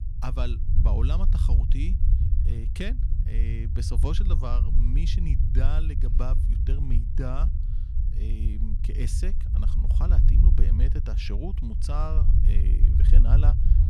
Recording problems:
low rumble; loud; throughout; 4 dB below the speech

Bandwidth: 14 kHz